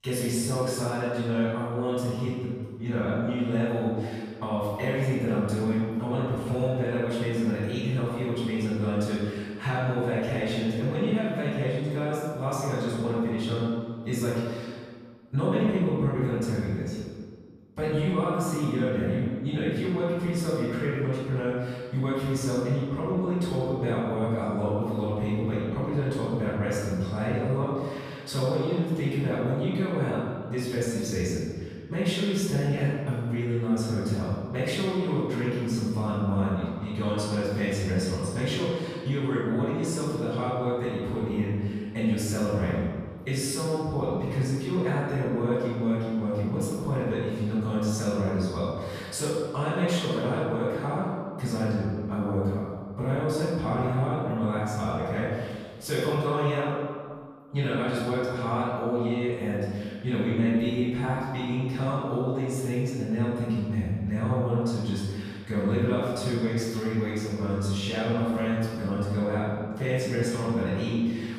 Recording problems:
room echo; strong; dies away in 1.6 s
off-mic speech; far

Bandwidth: 14.5 kHz